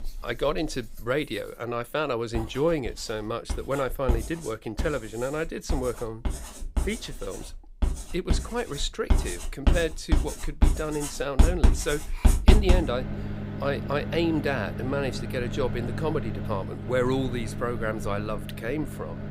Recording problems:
household noises; loud; throughout; as loud as the speech

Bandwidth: 15.5 kHz